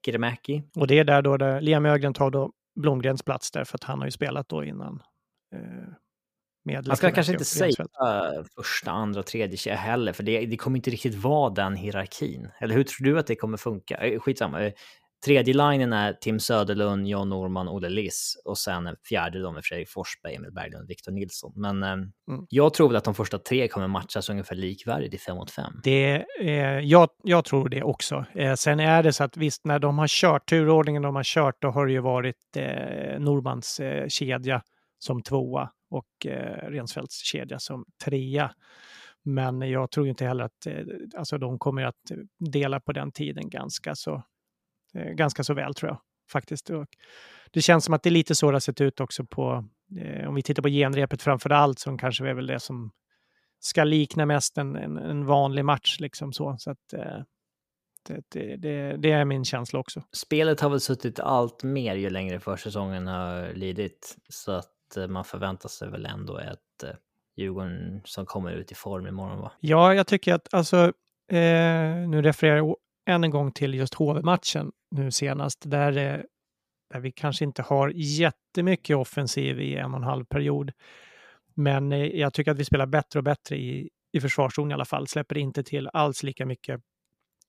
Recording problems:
none

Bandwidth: 15 kHz